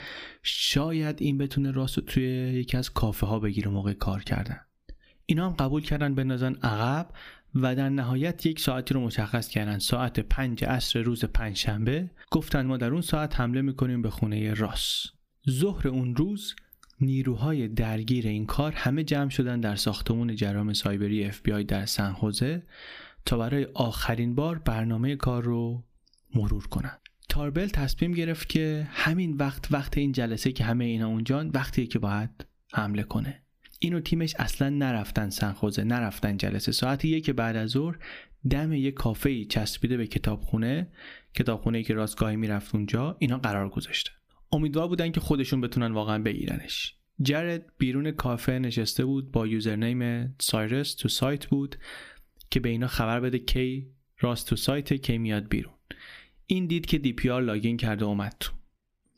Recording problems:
squashed, flat; somewhat

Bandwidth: 15 kHz